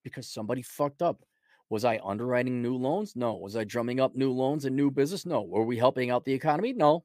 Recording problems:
none

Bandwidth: 15 kHz